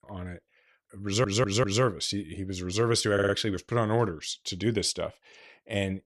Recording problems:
audio stuttering; at 1 s and at 3 s

